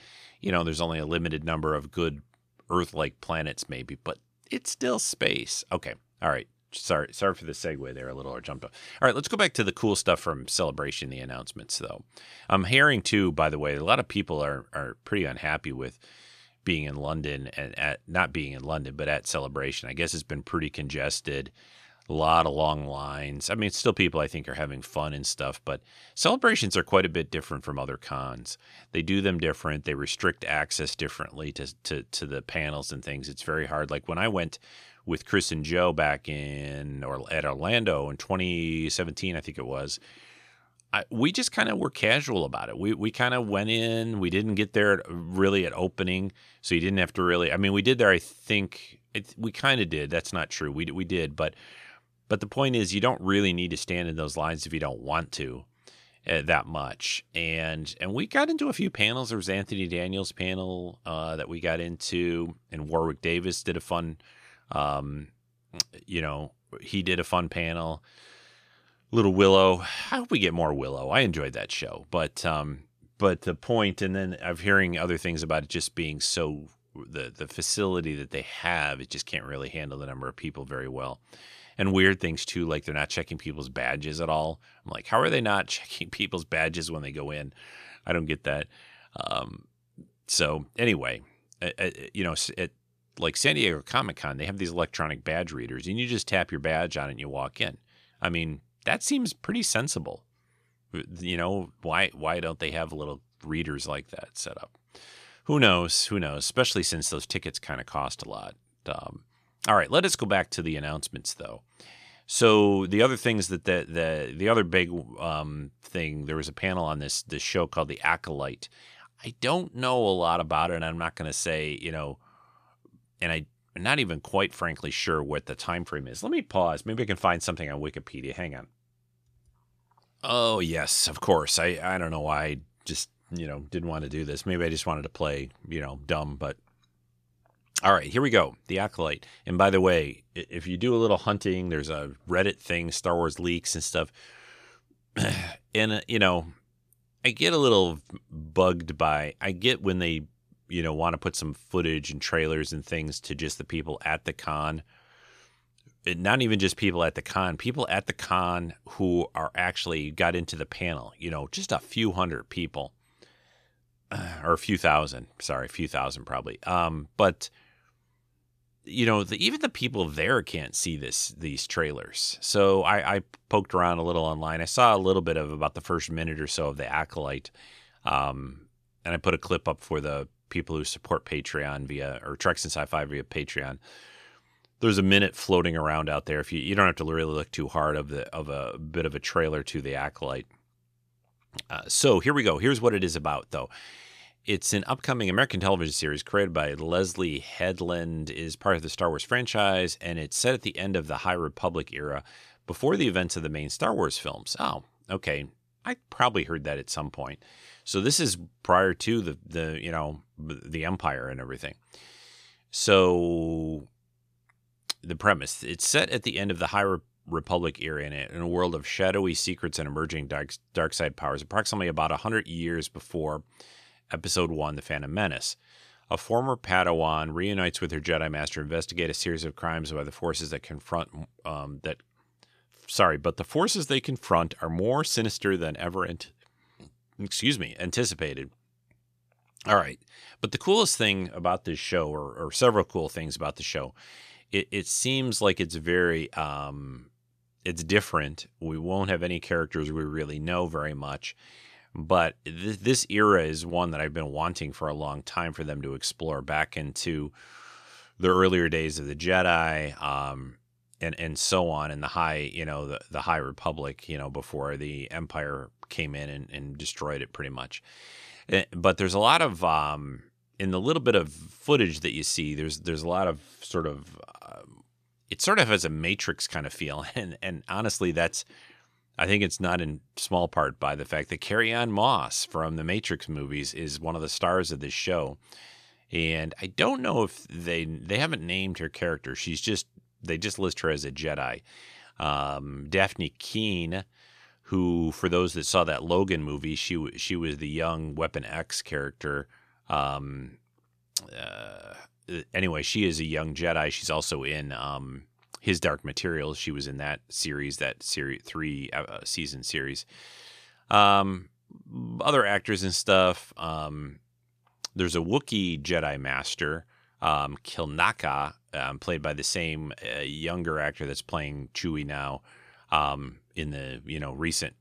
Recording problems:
none

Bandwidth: 14.5 kHz